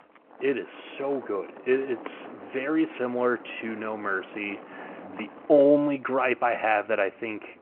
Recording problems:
phone-call audio
traffic noise; noticeable; throughout; 20 dB below the speech

